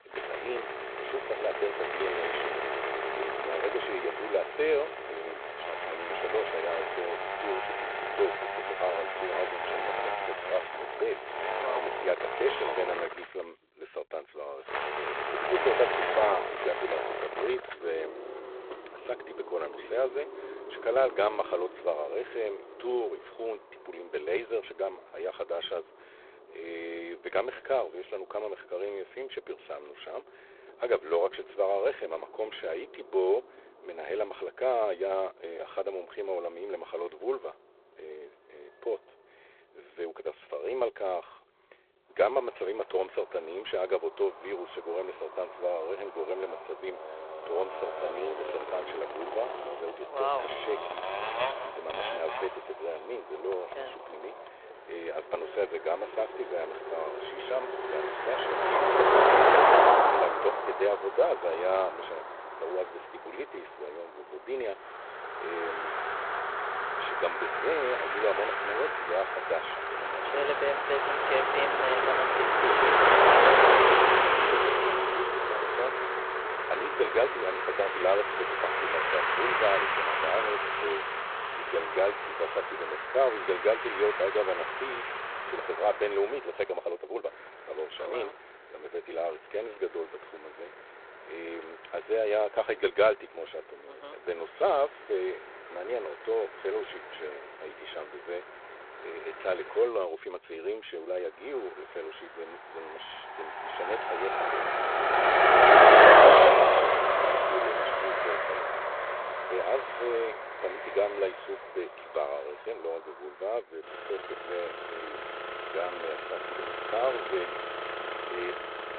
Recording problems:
phone-call audio; poor line; nothing above 3.5 kHz
traffic noise; very loud; throughout; 7 dB above the speech
uneven, jittery; strongly; from 9.5 s to 1:54

